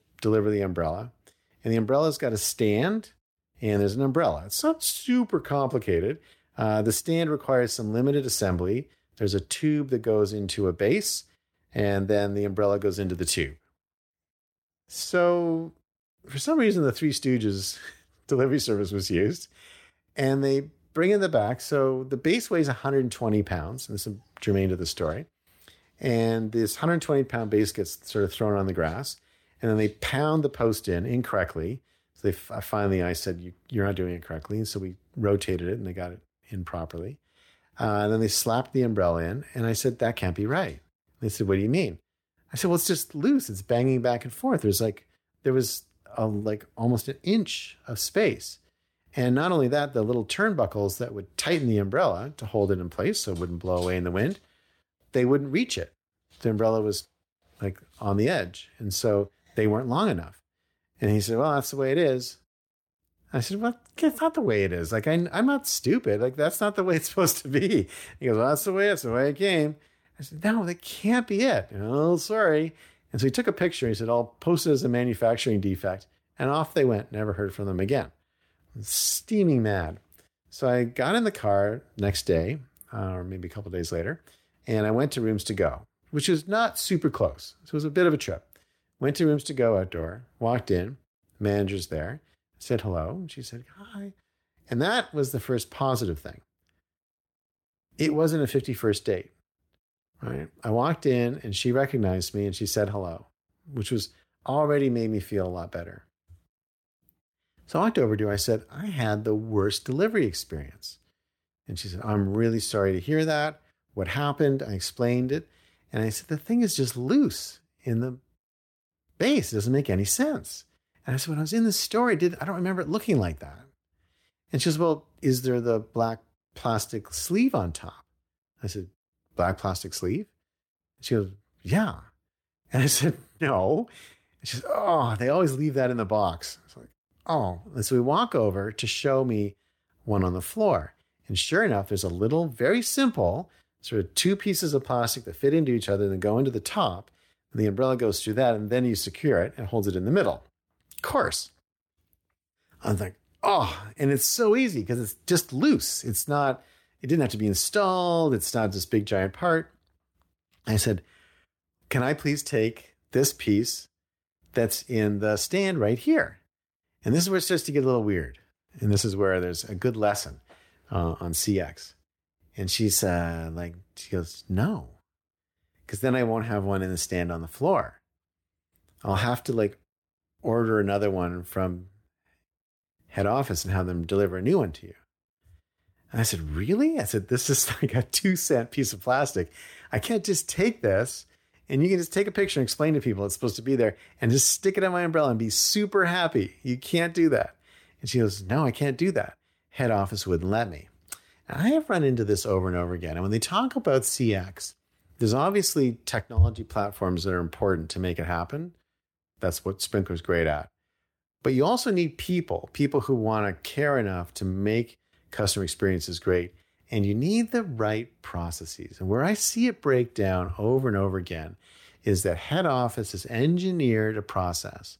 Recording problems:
none

